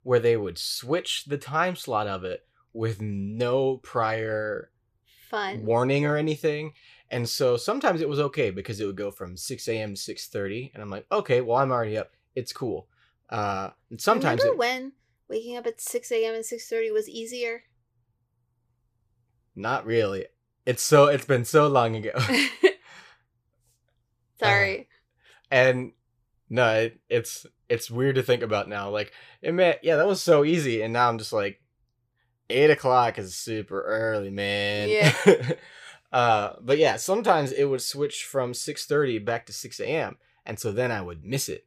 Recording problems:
none

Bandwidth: 15 kHz